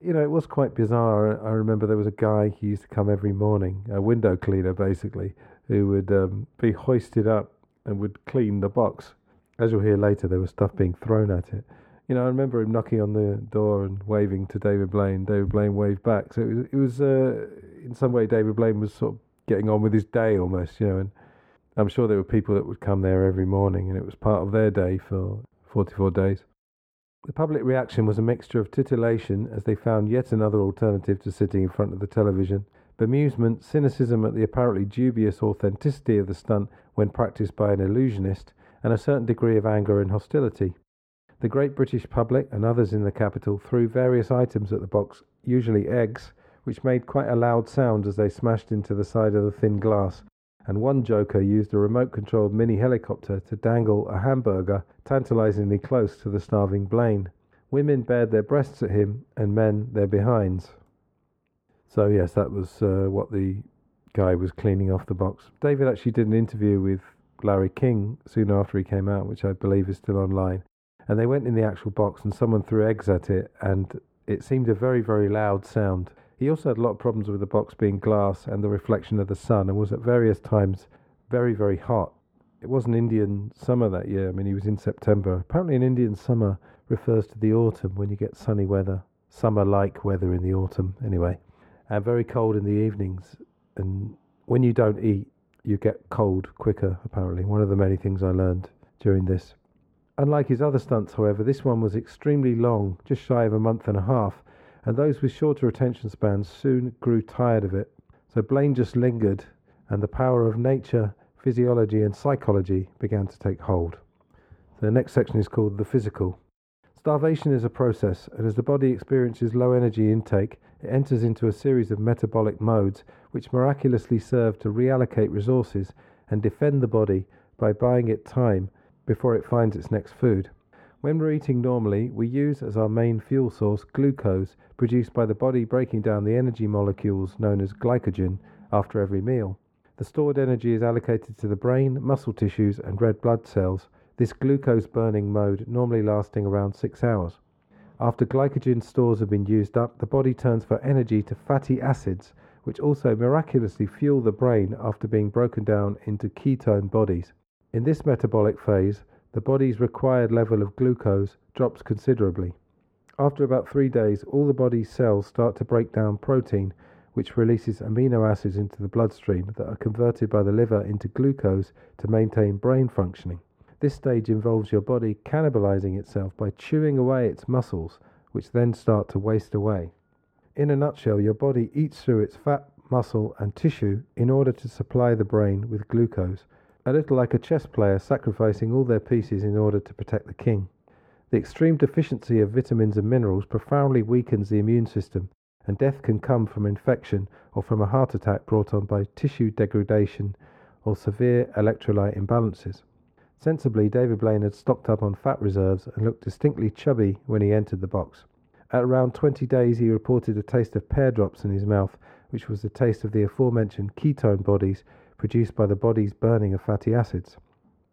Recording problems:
muffled; very; fading above 2.5 kHz

